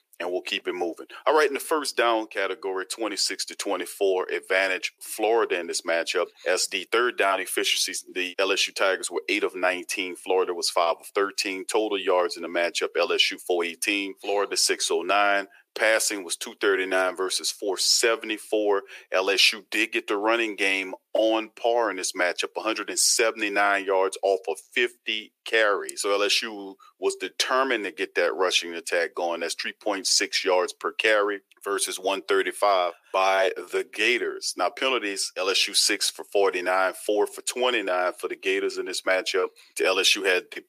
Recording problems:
thin; very; fading below 350 Hz

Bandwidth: 15 kHz